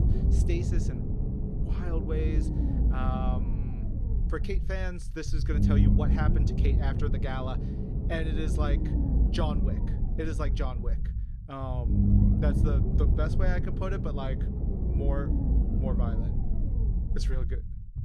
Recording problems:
low rumble; loud; throughout; 2 dB below the speech

